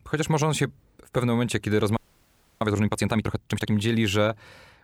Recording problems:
audio freezing; at 2 s for 0.5 s

